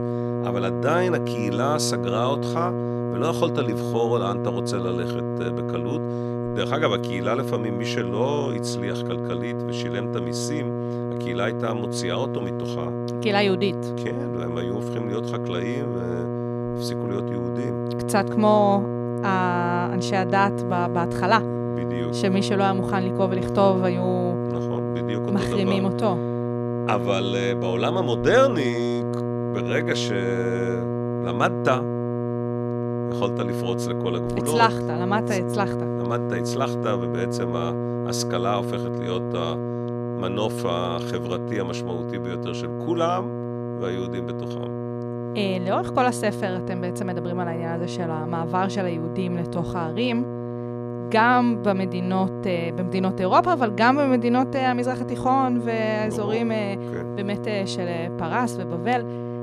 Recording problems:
electrical hum; loud; throughout; 60 Hz, 6 dB below the speech

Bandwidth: 13.5 kHz